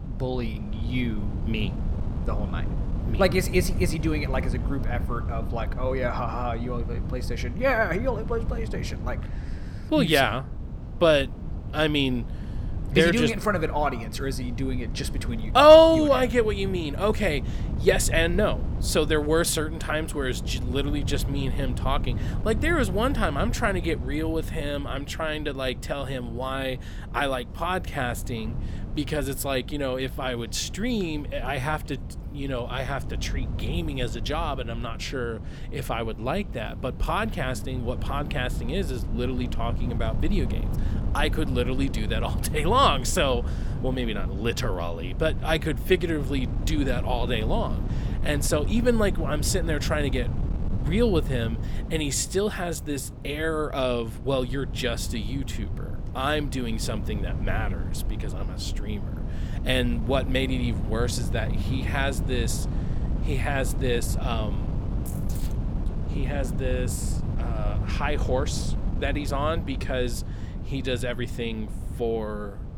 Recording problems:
wind noise on the microphone; occasional gusts; 15 dB below the speech

